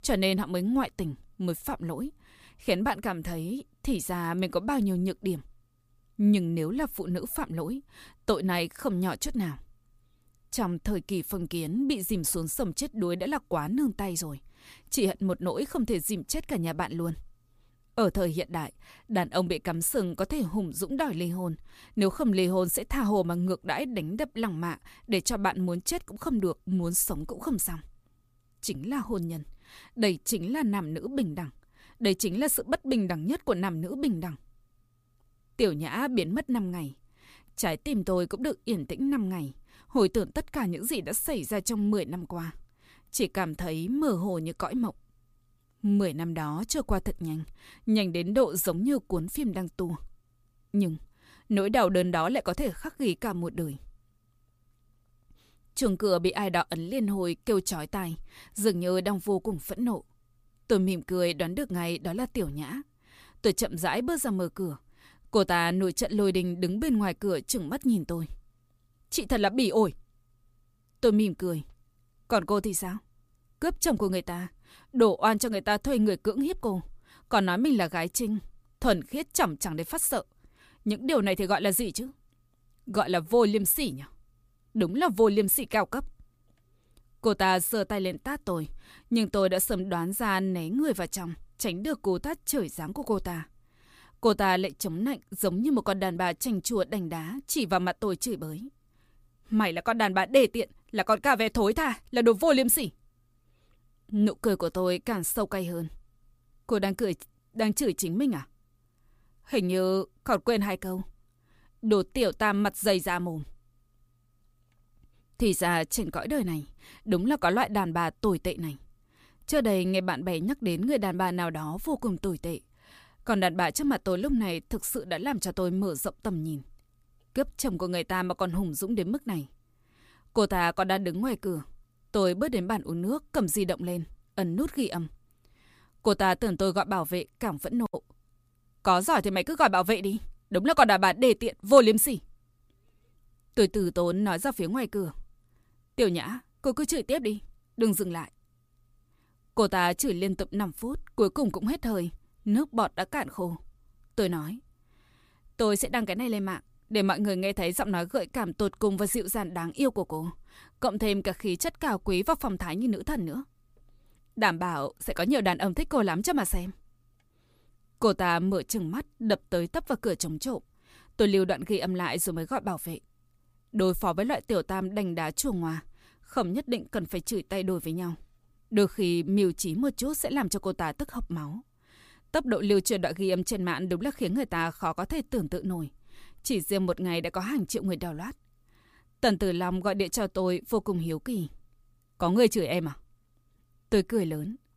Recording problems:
none

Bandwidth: 15 kHz